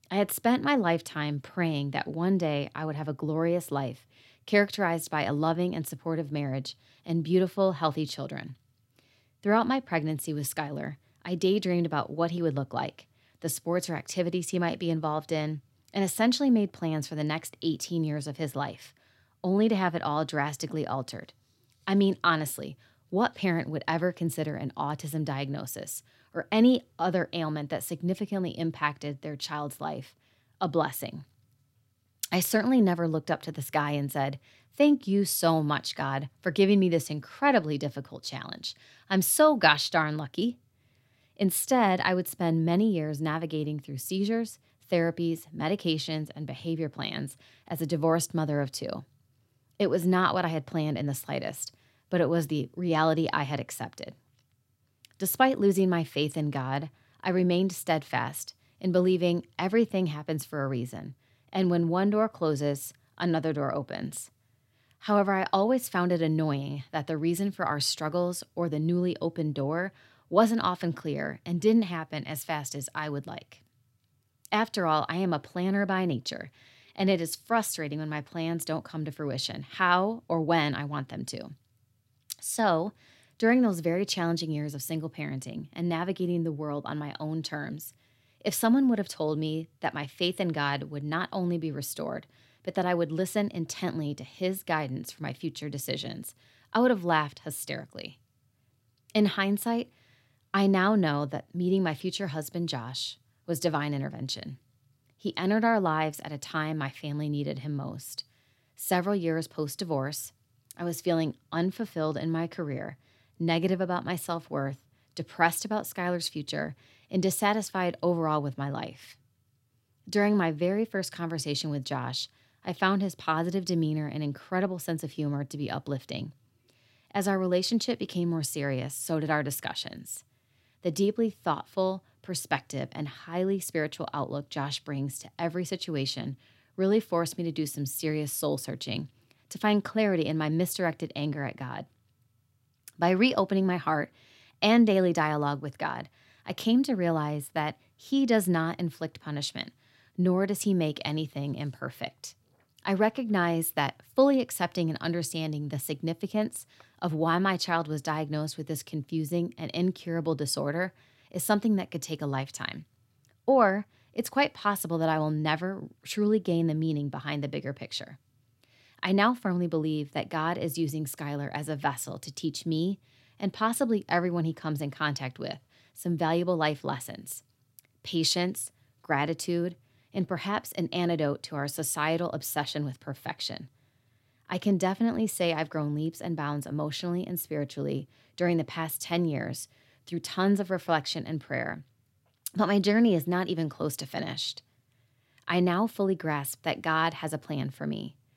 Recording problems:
none

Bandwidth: 16 kHz